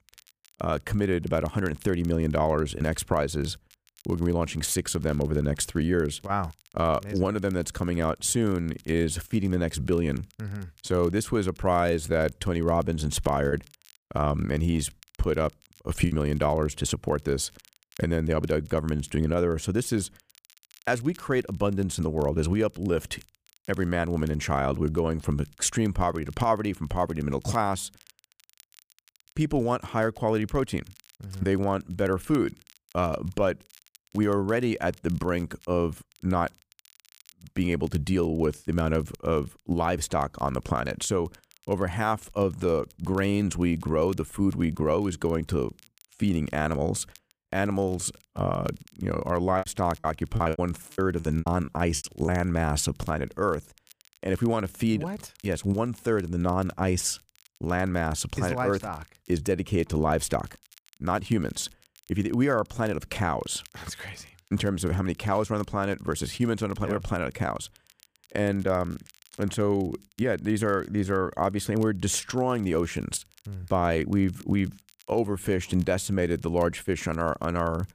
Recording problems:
crackle, like an old record; faint; 30 dB below the speech
choppy; very; from 13 to 16 s and from 50 to 52 s; 12% of the speech affected

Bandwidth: 15 kHz